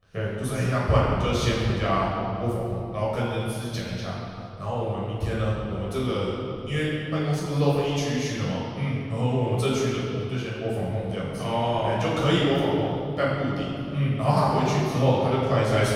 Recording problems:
room echo; strong; dies away in 2.4 s
off-mic speech; far

